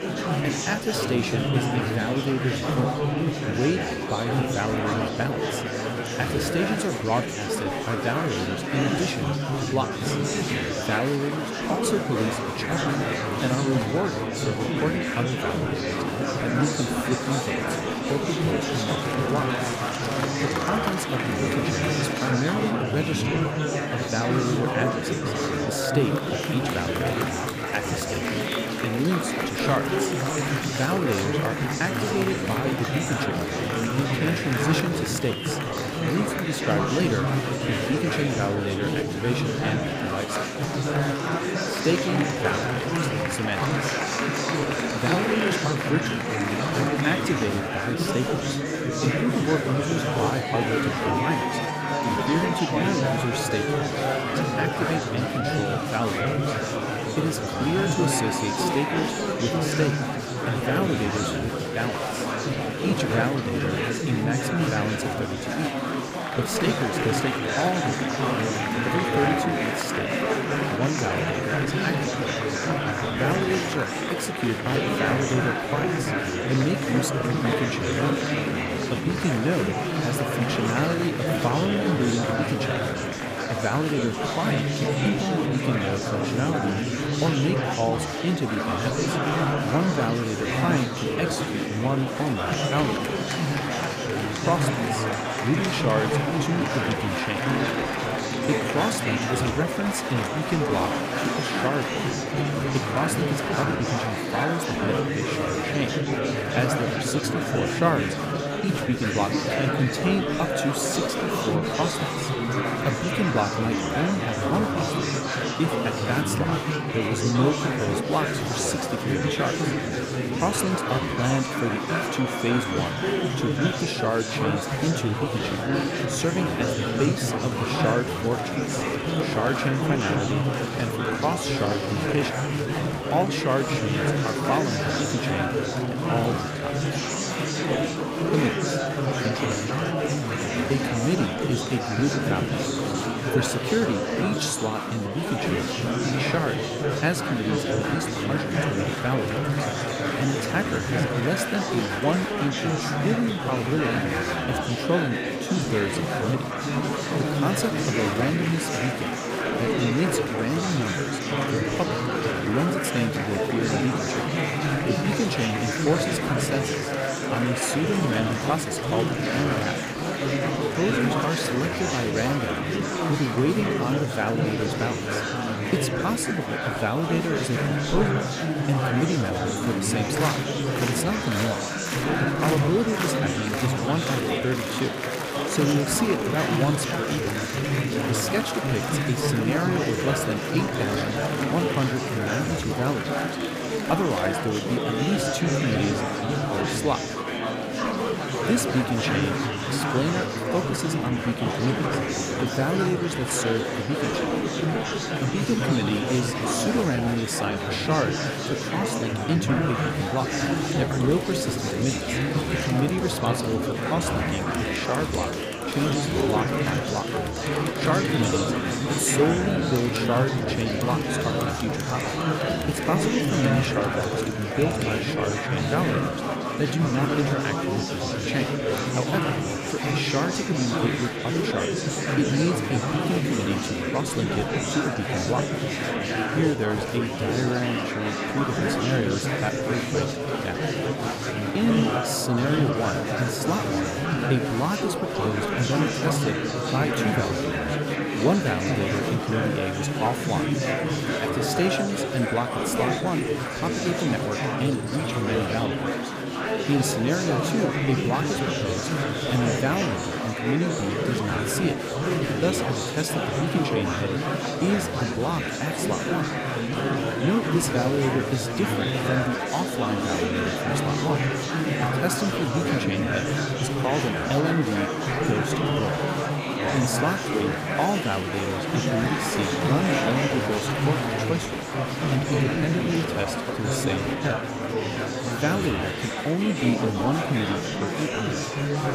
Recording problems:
murmuring crowd; very loud; throughout; 2 dB above the speech

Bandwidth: 15 kHz